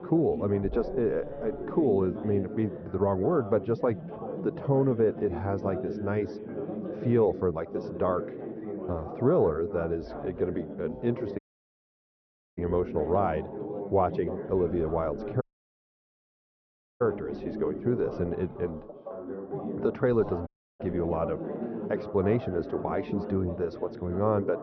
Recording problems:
high frequencies cut off; noticeable; nothing above 6 kHz
muffled; very slightly; fading above 2.5 kHz
background chatter; loud; throughout; 4 voices, 8 dB below the speech
audio cutting out; at 11 s for 1 s, at 15 s for 1.5 s and at 20 s

